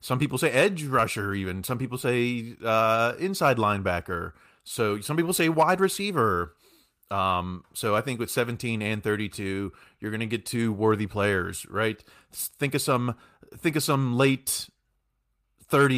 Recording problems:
abrupt cut into speech; at the end

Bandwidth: 15 kHz